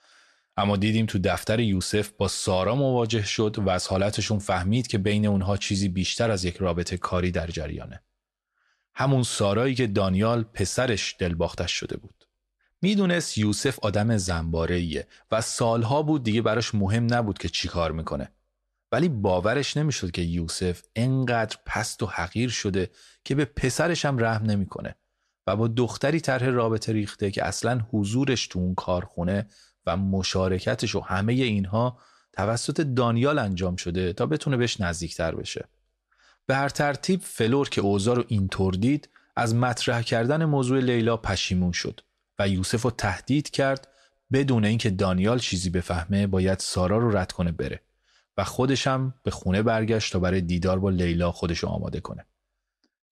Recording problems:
none

